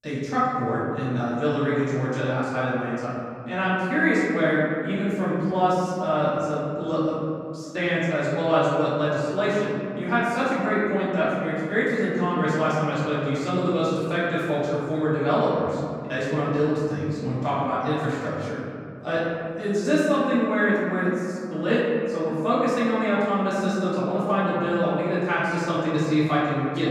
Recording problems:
room echo; strong; dies away in 2.3 s
off-mic speech; far

